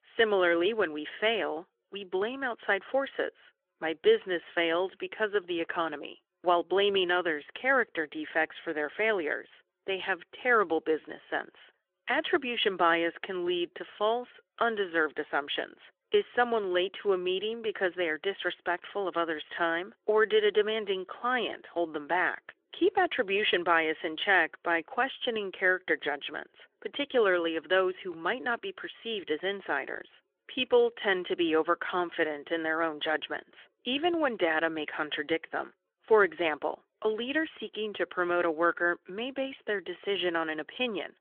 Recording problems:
phone-call audio; nothing above 3.5 kHz

